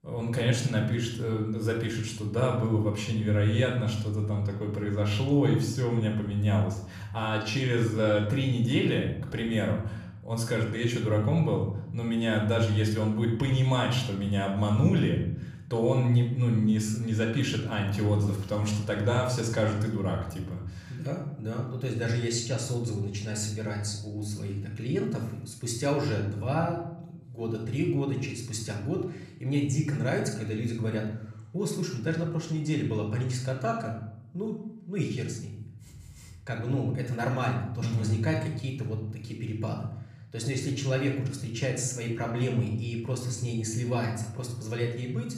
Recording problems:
room echo; noticeable; dies away in 0.7 s
off-mic speech; somewhat distant

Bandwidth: 15 kHz